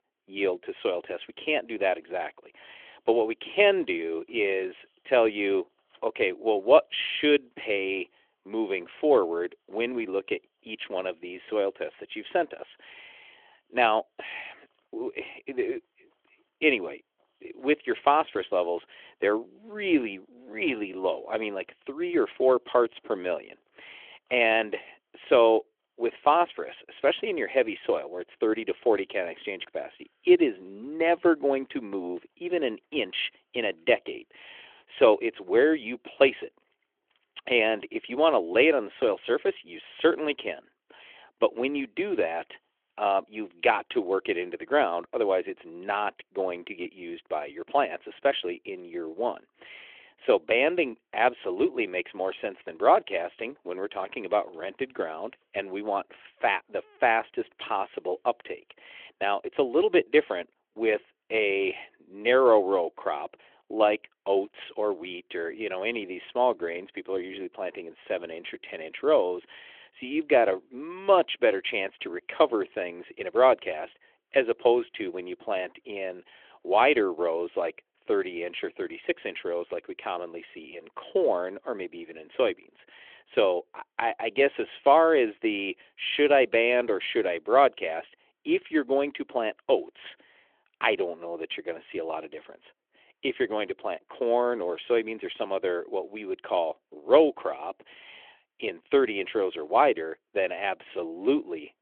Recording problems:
phone-call audio; nothing above 3.5 kHz

